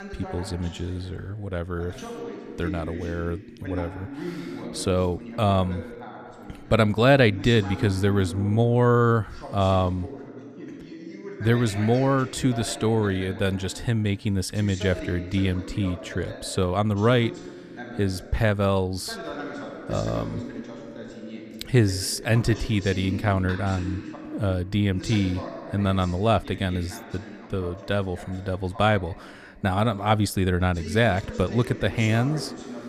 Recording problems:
voice in the background; noticeable; throughout; 15 dB below the speech

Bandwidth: 14.5 kHz